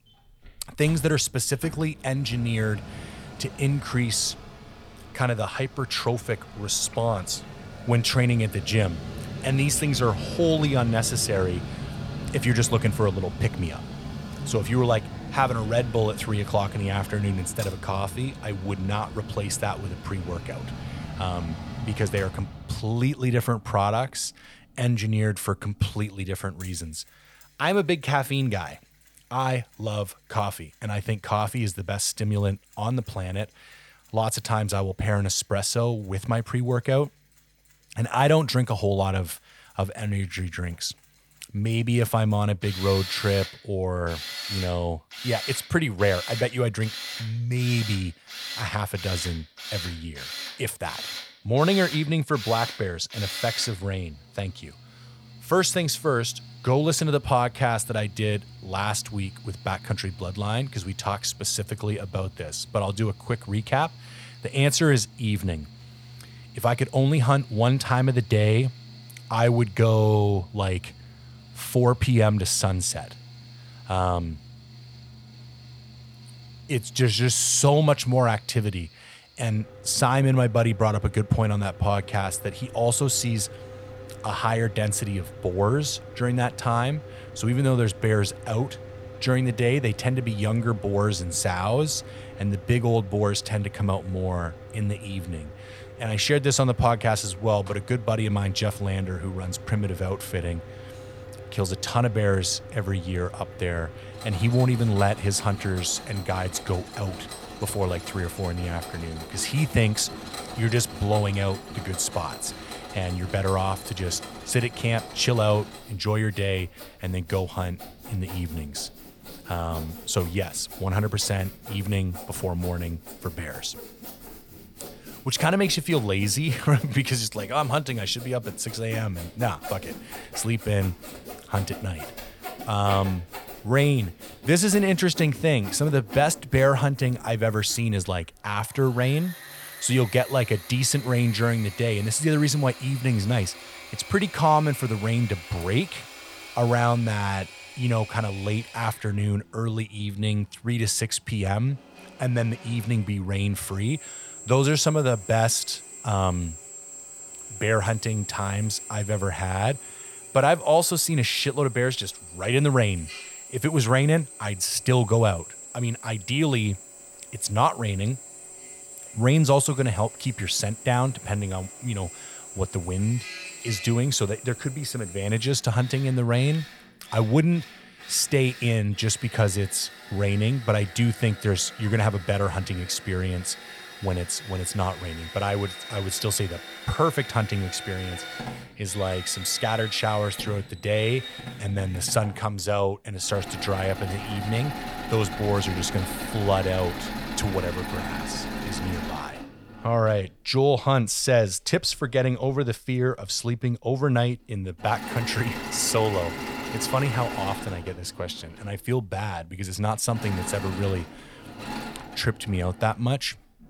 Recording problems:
machinery noise; noticeable; throughout; 15 dB below the speech

